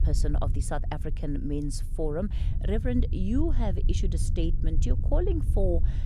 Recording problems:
low rumble; noticeable; throughout; 10 dB below the speech

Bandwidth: 15 kHz